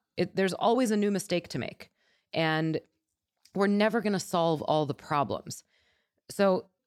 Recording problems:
none

